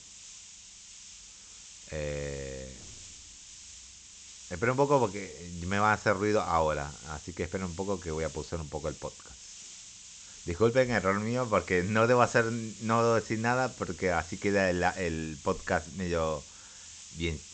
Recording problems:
high frequencies cut off; noticeable; nothing above 8 kHz
hiss; noticeable; throughout; 15 dB below the speech

